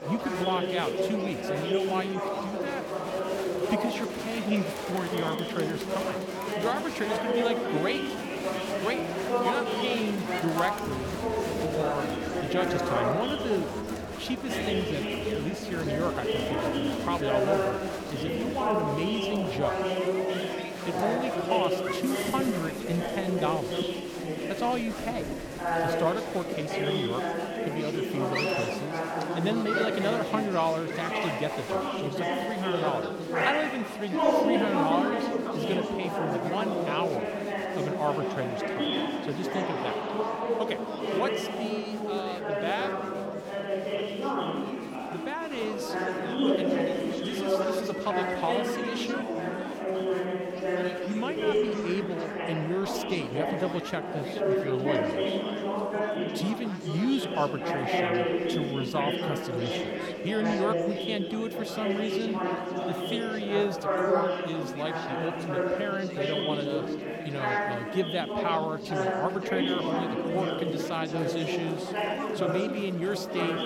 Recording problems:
chatter from many people; very loud; throughout; 3 dB above the speech

